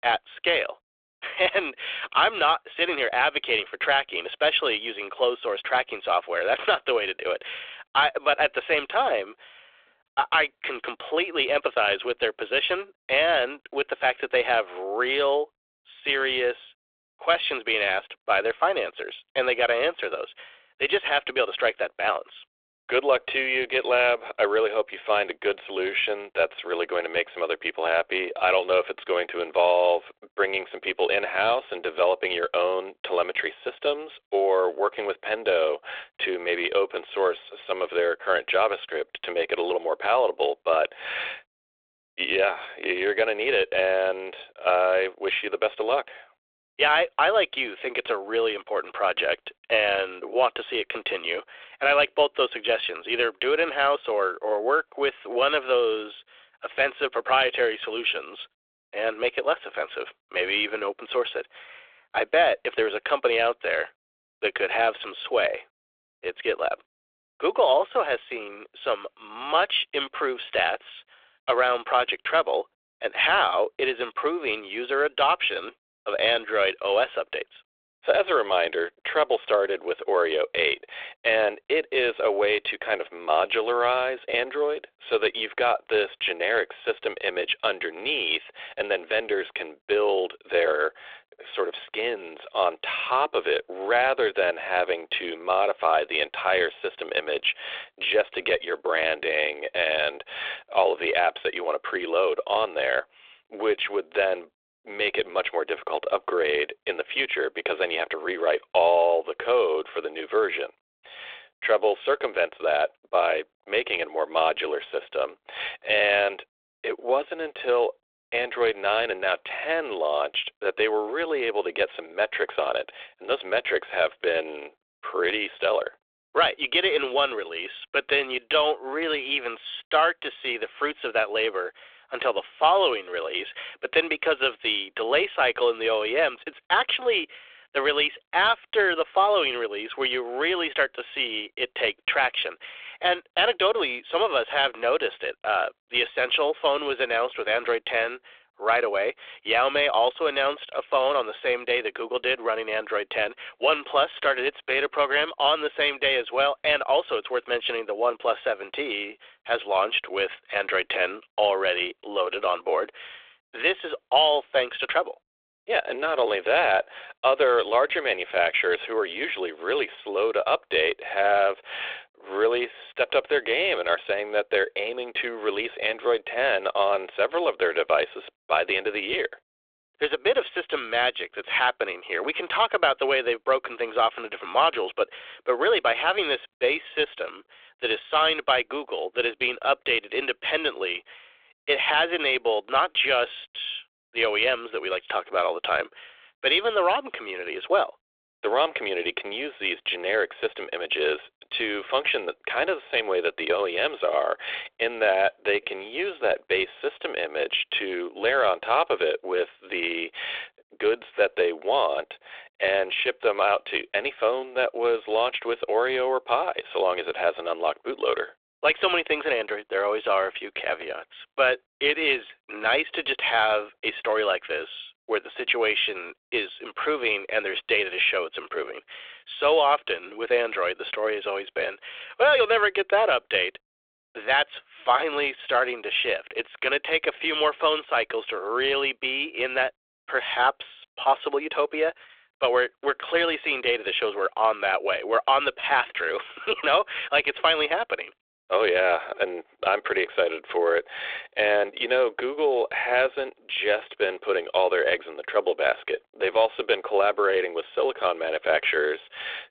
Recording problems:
phone-call audio; nothing above 3.5 kHz

